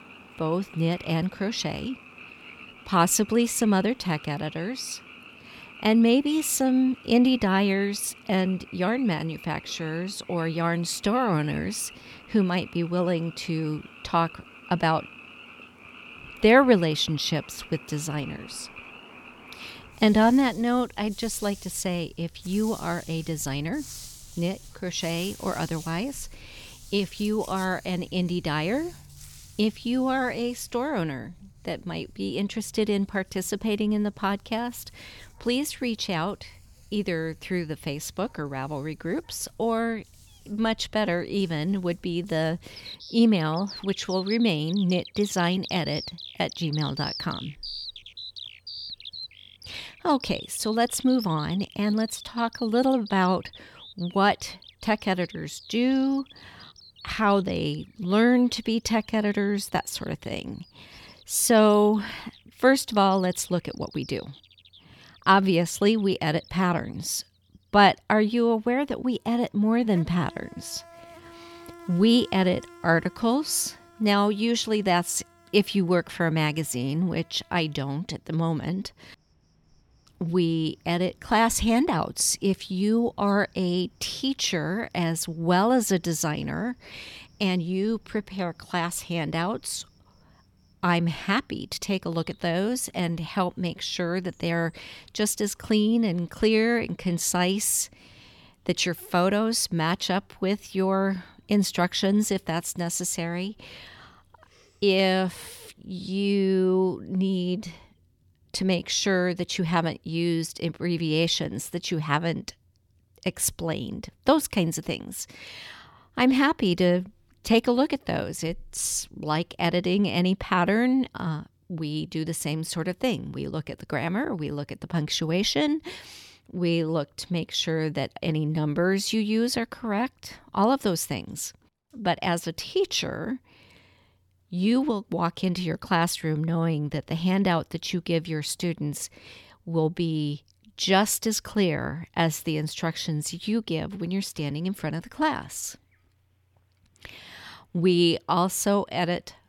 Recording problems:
animal sounds; noticeable; throughout; 20 dB below the speech

